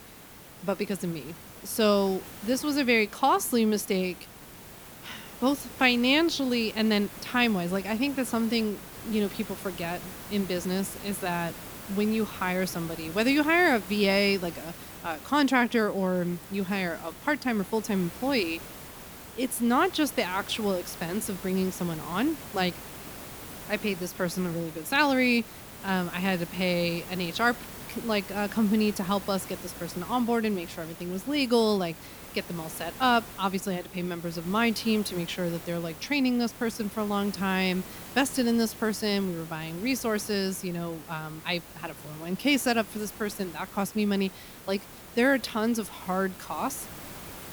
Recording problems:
hiss; noticeable; throughout; 15 dB below the speech

